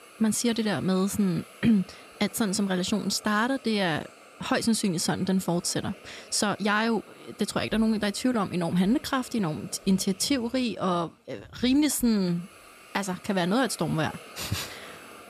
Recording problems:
hiss; faint; throughout; 20 dB below the speech

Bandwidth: 14.5 kHz